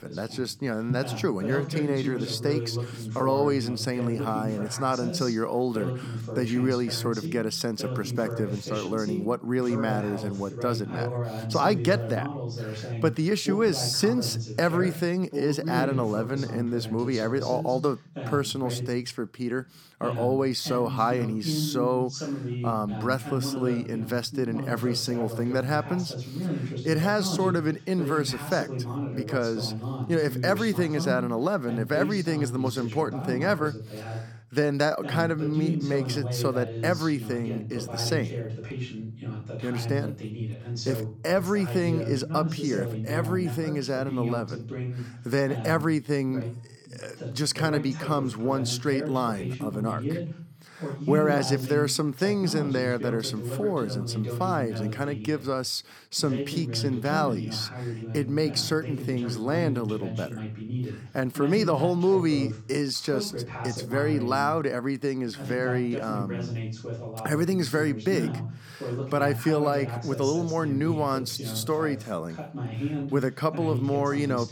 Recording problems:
voice in the background; loud; throughout; 6 dB below the speech

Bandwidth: 18 kHz